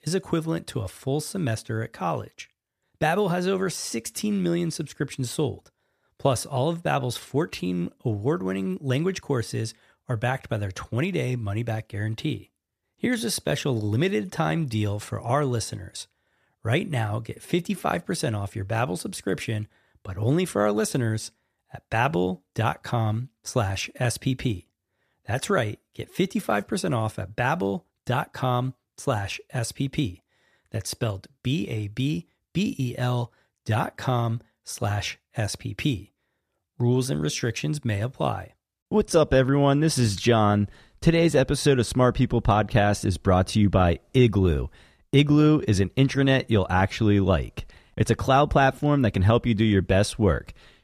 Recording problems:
none

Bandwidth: 14.5 kHz